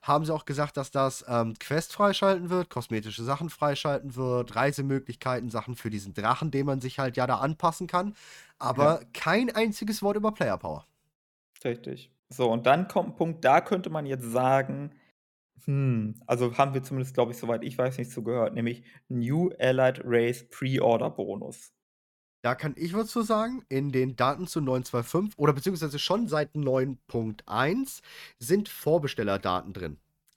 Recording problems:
none

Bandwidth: 18 kHz